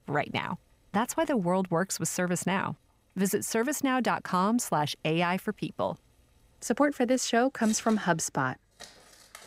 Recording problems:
household noises; faint; throughout; 25 dB below the speech

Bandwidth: 15.5 kHz